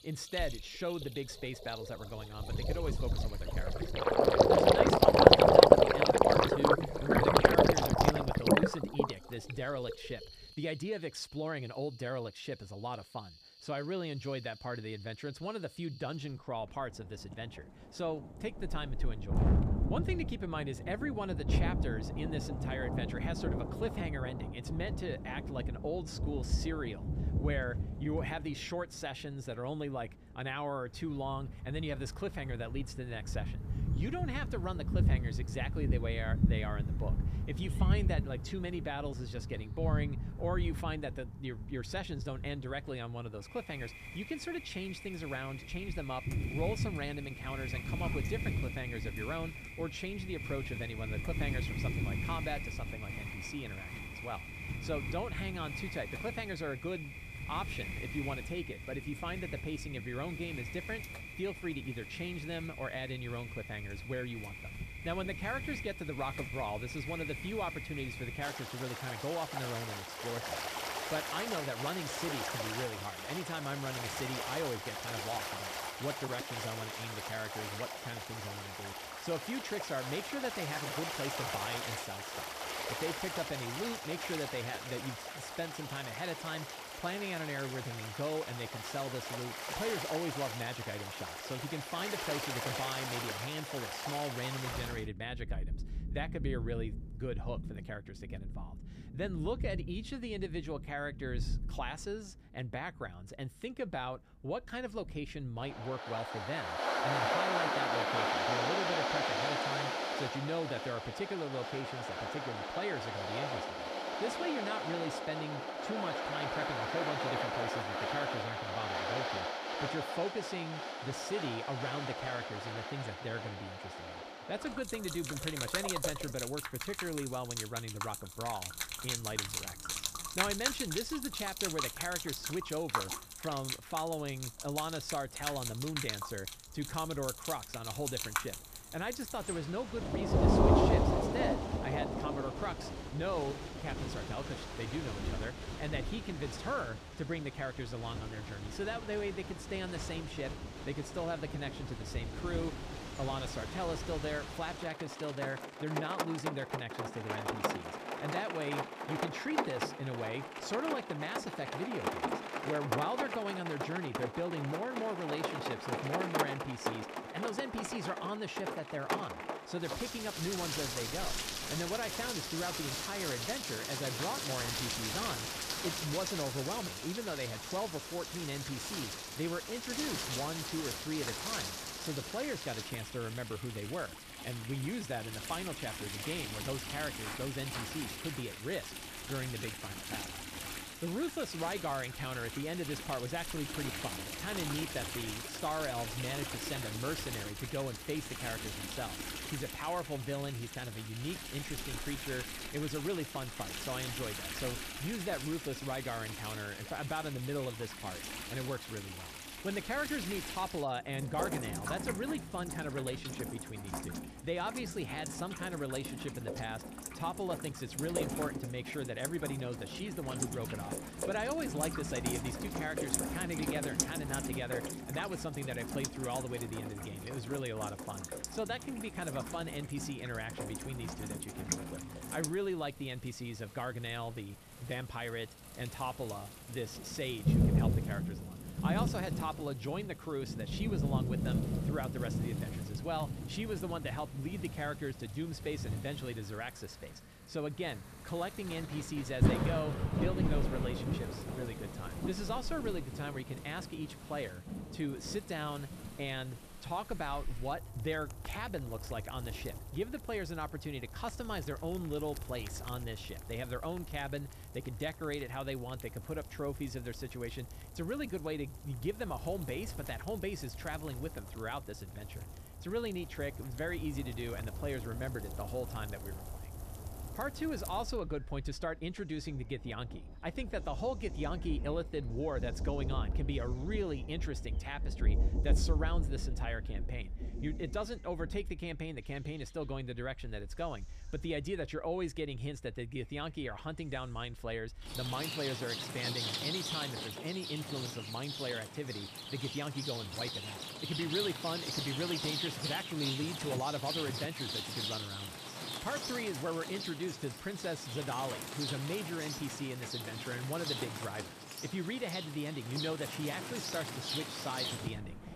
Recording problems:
rain or running water; very loud; throughout; 3 dB above the speech

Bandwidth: 14.5 kHz